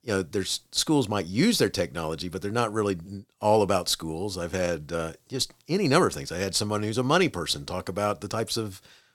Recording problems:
none

